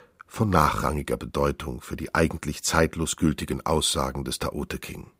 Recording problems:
none

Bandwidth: 15.5 kHz